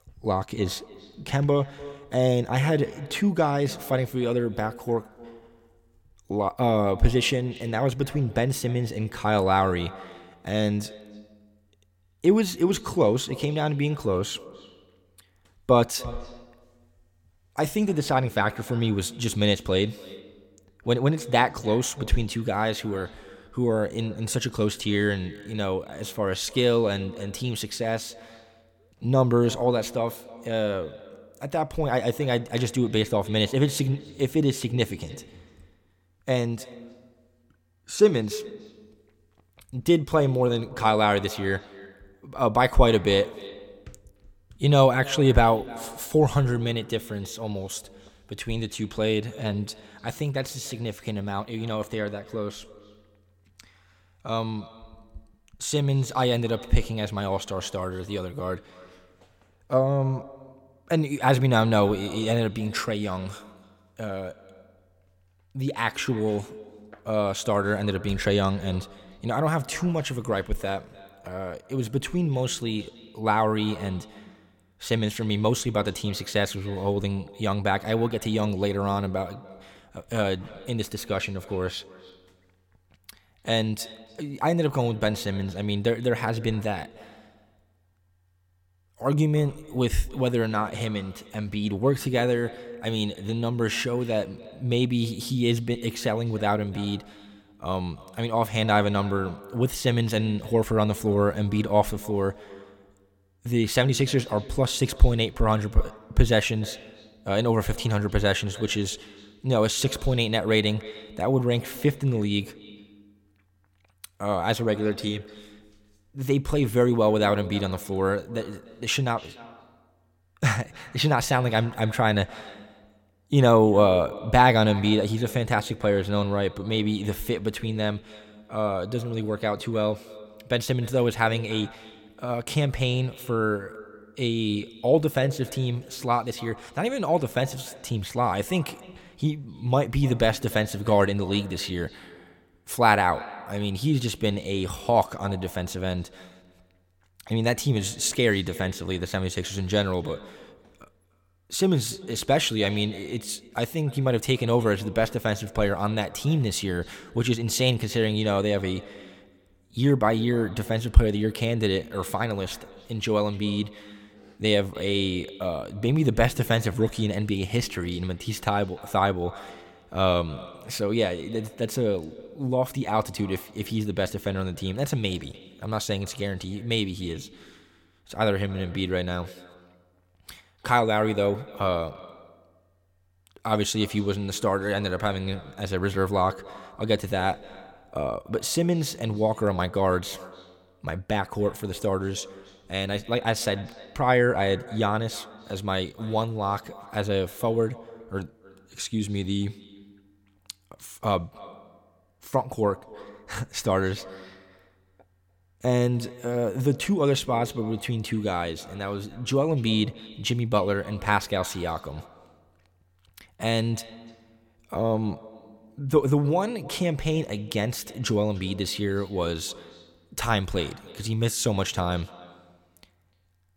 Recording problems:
echo of what is said; faint; throughout; 300 ms later, 20 dB below the speech

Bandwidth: 17 kHz